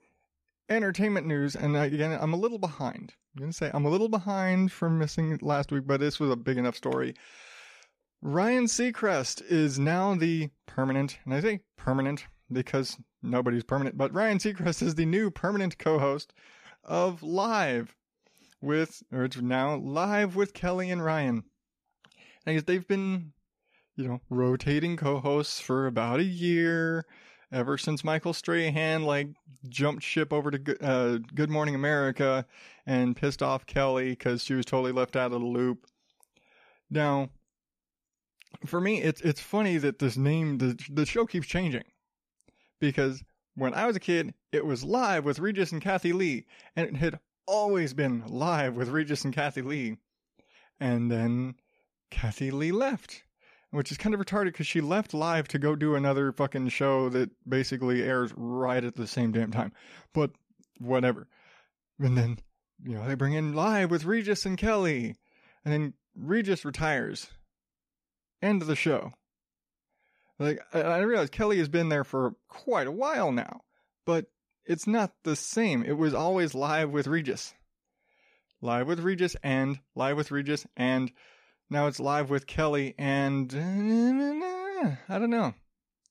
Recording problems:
none

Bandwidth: 14.5 kHz